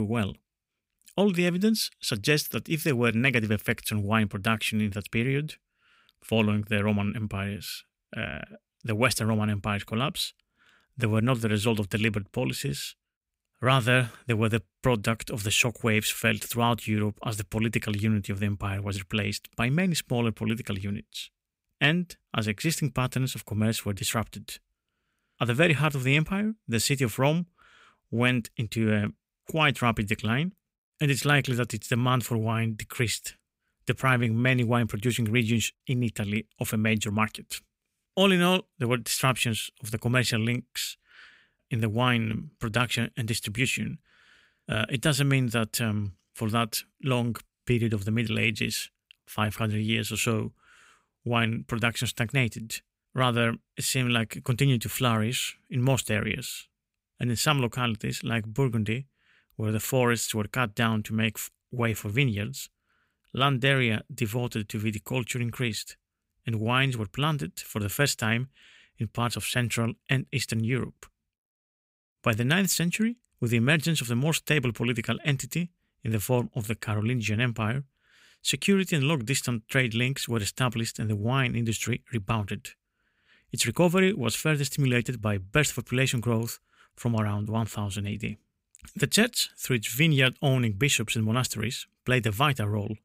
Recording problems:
abrupt cut into speech; at the start

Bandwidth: 15.5 kHz